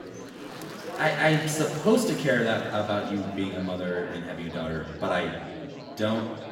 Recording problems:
off-mic speech; far
room echo; noticeable; dies away in 1.2 s
murmuring crowd; noticeable; throughout; 10 dB below the speech

